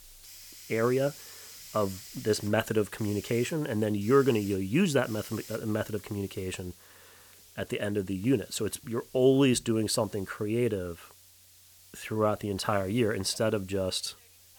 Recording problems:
hiss; noticeable; throughout; 20 dB below the speech

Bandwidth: 19 kHz